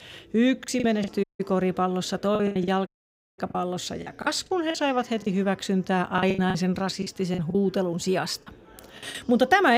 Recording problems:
chatter from many people; faint; throughout; 25 dB below the speech
choppy; very; at 0.5 s, from 2.5 to 5.5 s and from 6 to 9 s; 14% of the speech affected
audio cutting out; at 1 s and at 3 s for 0.5 s
abrupt cut into speech; at the end

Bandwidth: 15.5 kHz